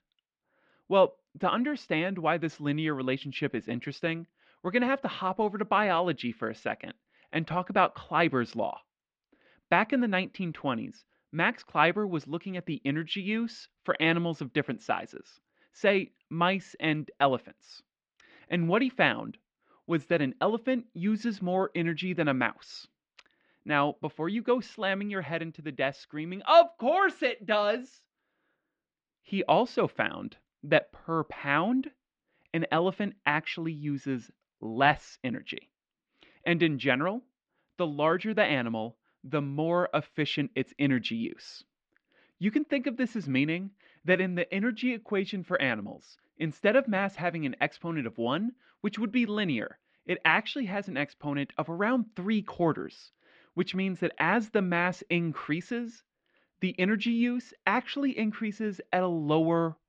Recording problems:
muffled; slightly; fading above 3.5 kHz

